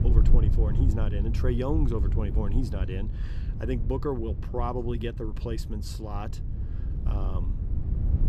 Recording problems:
wind noise on the microphone; heavy; 9 dB below the speech

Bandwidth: 14 kHz